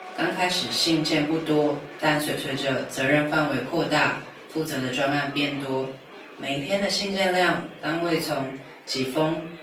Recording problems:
off-mic speech; far
thin; somewhat; fading below 300 Hz
room echo; slight; dies away in 0.4 s
garbled, watery; slightly; nothing above 18.5 kHz
chatter from many people; noticeable; throughout; 15 dB below the speech

